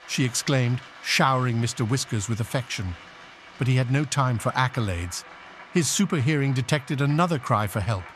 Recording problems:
crowd noise; noticeable; throughout; 20 dB below the speech

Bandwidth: 13.5 kHz